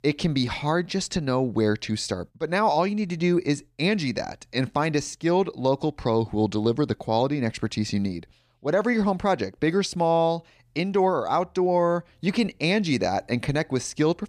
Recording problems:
none

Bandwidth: 14.5 kHz